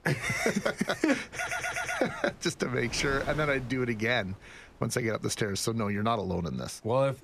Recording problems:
wind noise on the microphone; occasional gusts; 20 dB below the speech
audio stuttering; at 1.5 s

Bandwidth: 14.5 kHz